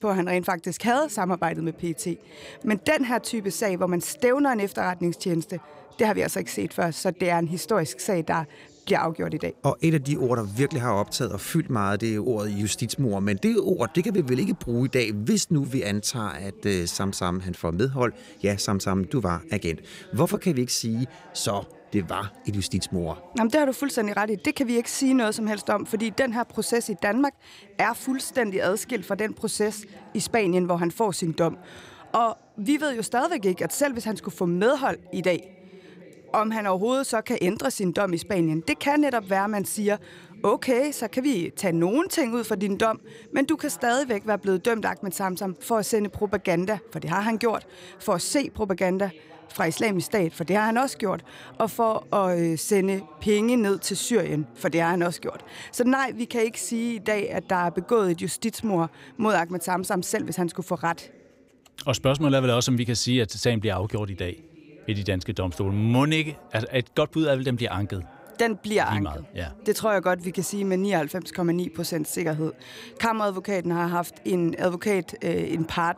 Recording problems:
voice in the background; faint; throughout; 25 dB below the speech

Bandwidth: 15.5 kHz